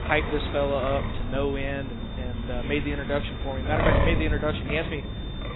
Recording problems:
garbled, watery; badly; nothing above 4 kHz
wind noise on the microphone; heavy; 3 dB below the speech
rain or running water; loud; throughout; 7 dB below the speech
high-pitched whine; noticeable; throughout; 3.5 kHz, 20 dB below the speech

